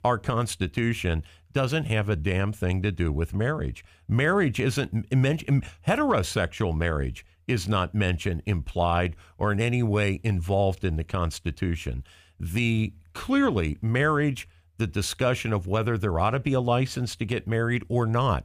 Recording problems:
none

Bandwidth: 15 kHz